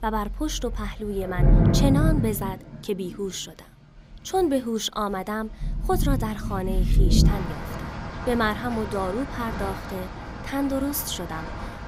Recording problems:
rain or running water; very loud; throughout; 1 dB above the speech

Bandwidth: 15.5 kHz